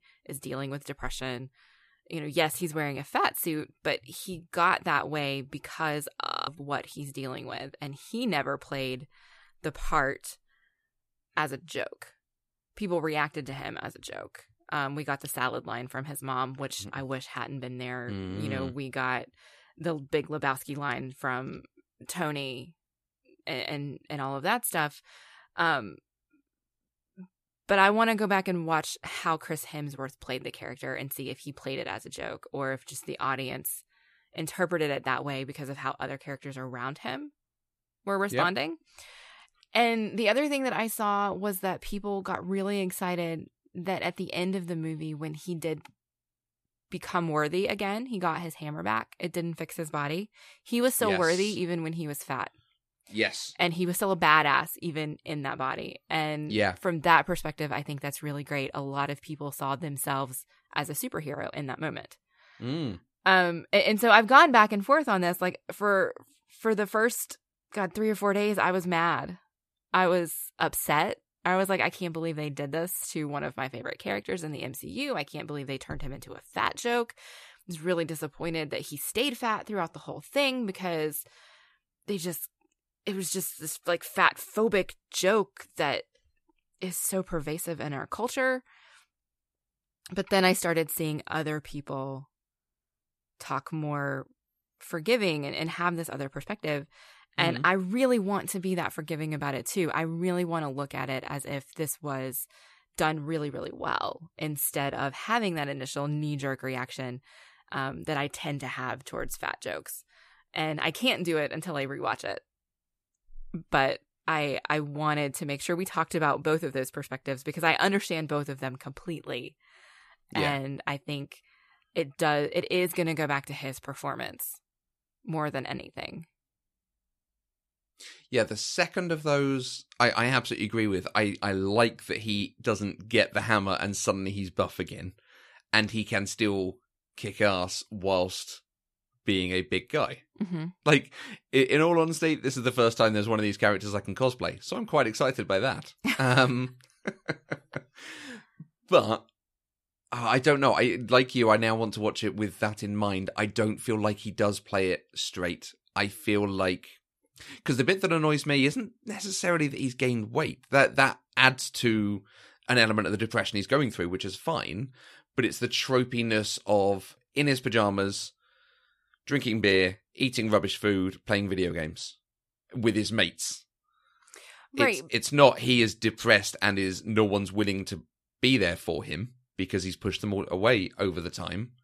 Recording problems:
audio freezing; at 6.5 s

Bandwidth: 14.5 kHz